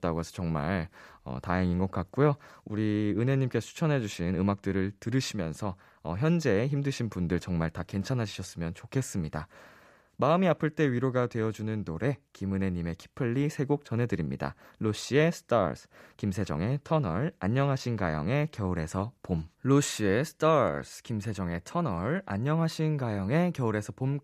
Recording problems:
none

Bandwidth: 14.5 kHz